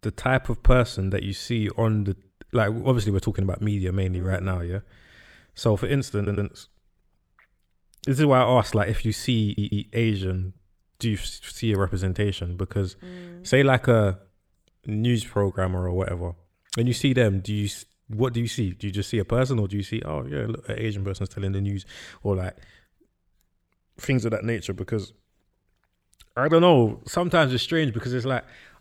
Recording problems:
audio stuttering; at 6 s and at 9.5 s

